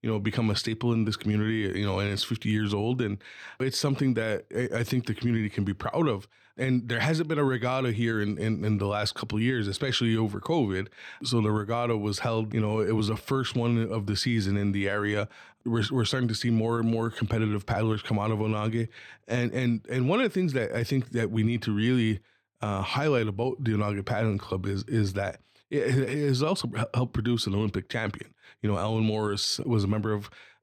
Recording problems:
none

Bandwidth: 18 kHz